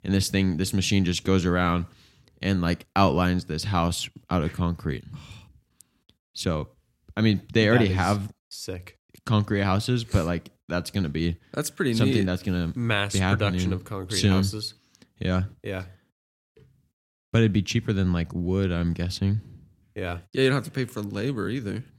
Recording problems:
none

